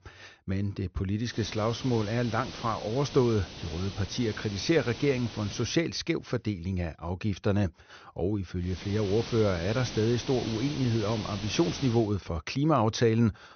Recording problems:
high frequencies cut off; noticeable; nothing above 6 kHz
hiss; noticeable; from 1.5 to 5.5 s and from 8.5 to 12 s; 10 dB below the speech

